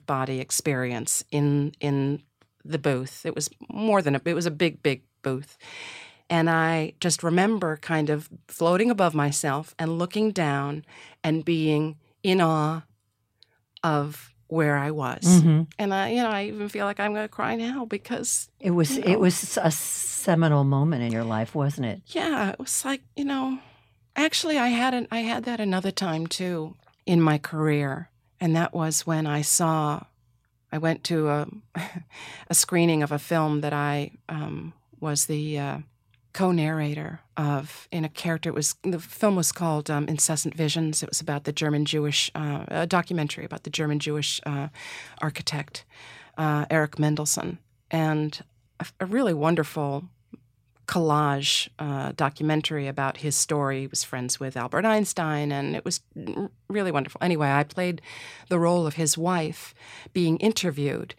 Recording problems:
none

